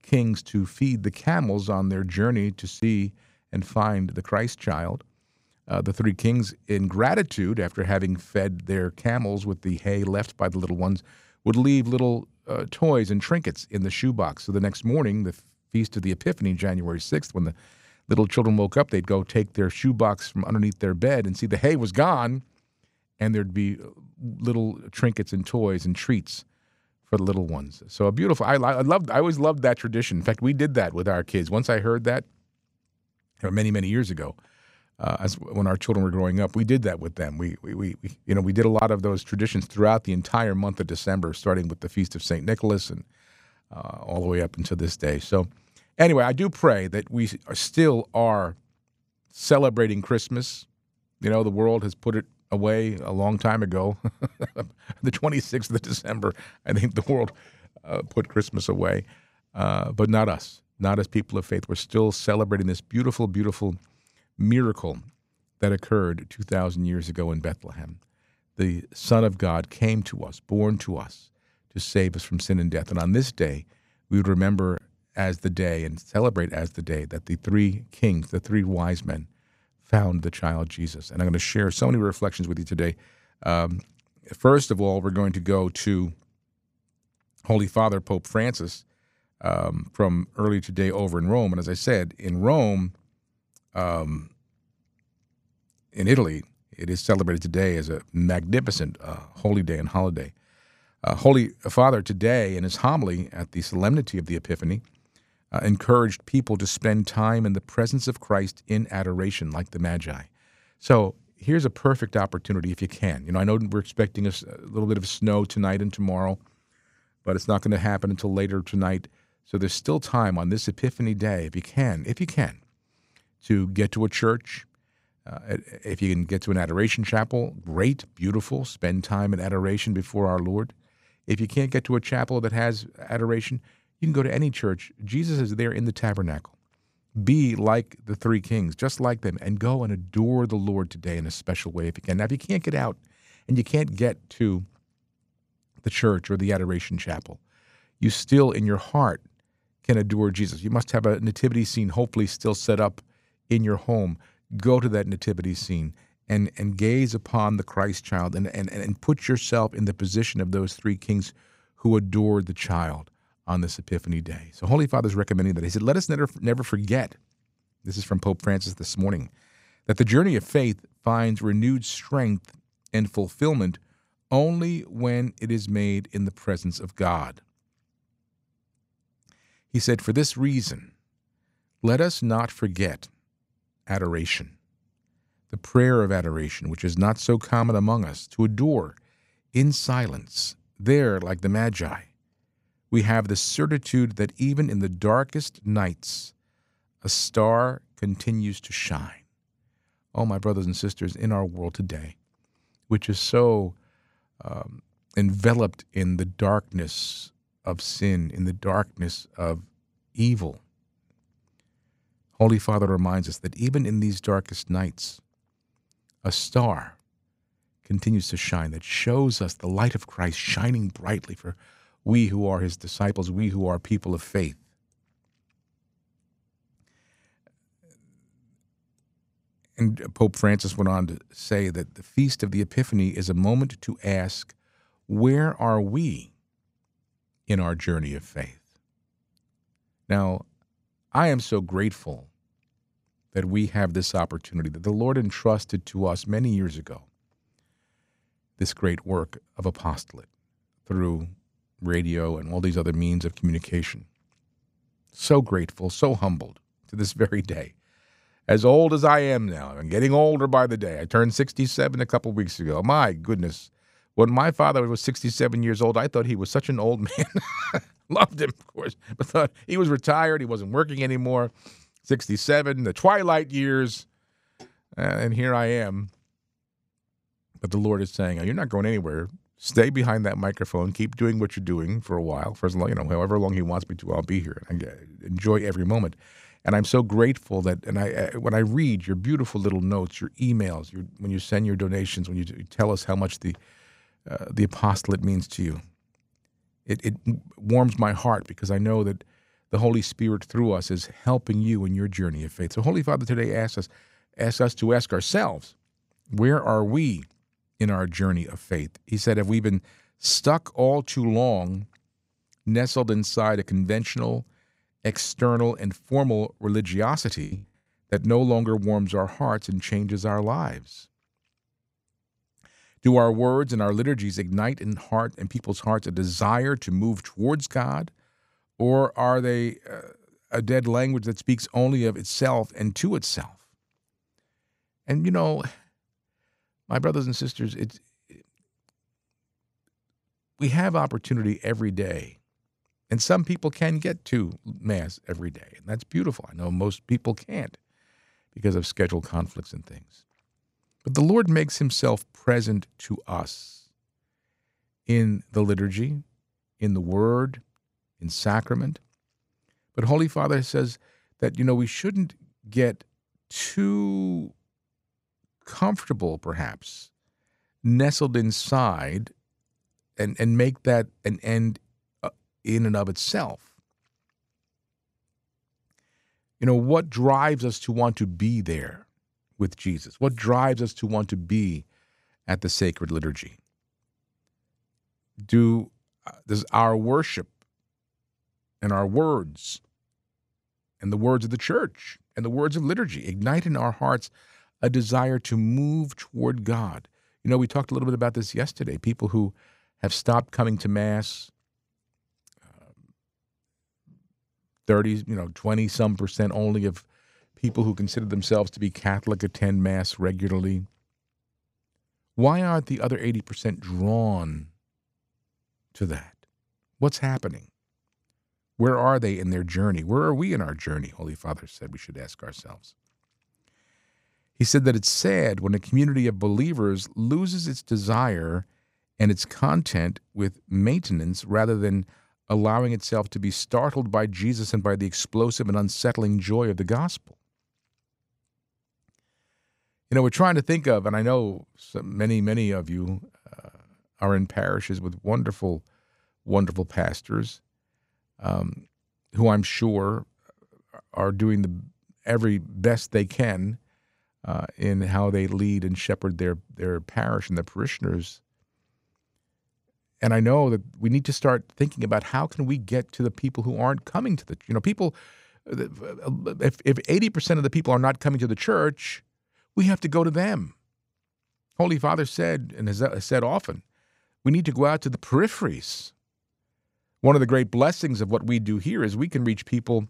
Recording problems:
choppy; very; at 5:17; 13% of the speech affected

